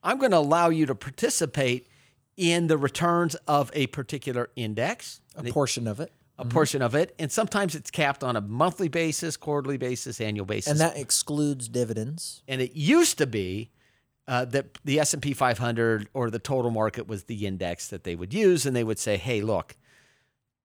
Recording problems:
none

